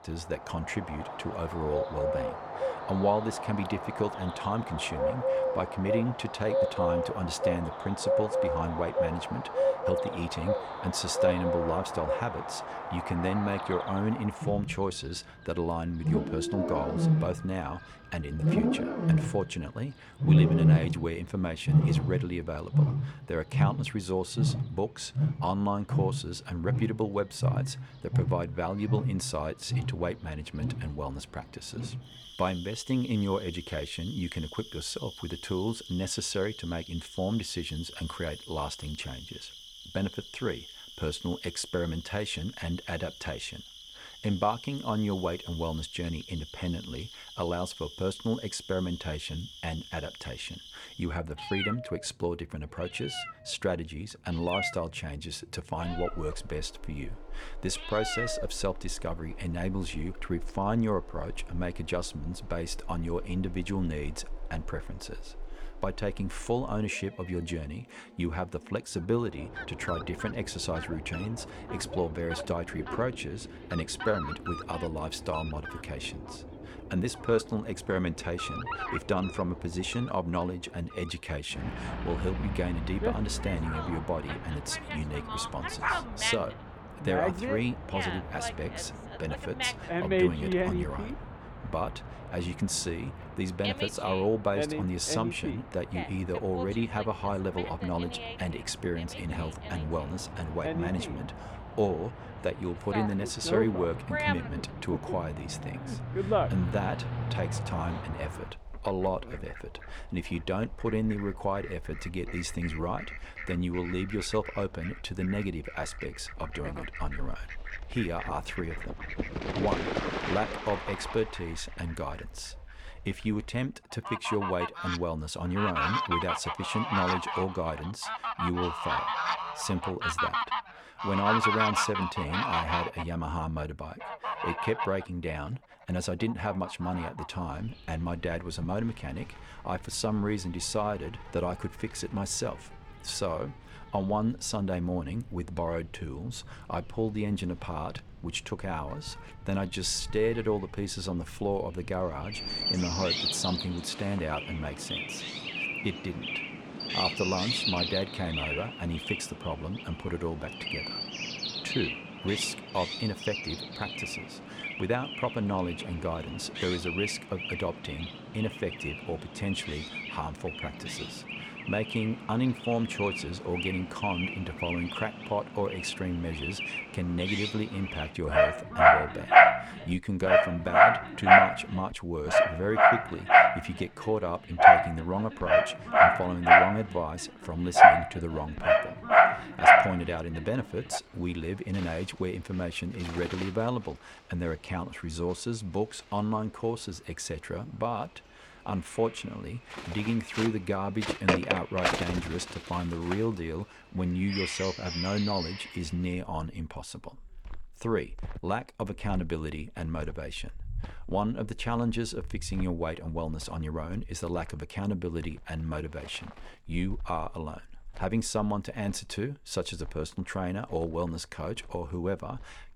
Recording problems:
animal sounds; very loud; throughout; 4 dB above the speech

